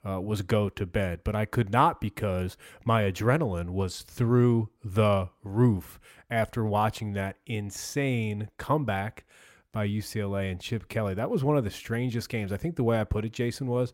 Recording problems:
none

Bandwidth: 16 kHz